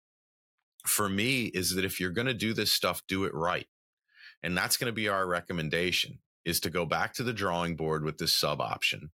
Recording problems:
none

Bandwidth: 16.5 kHz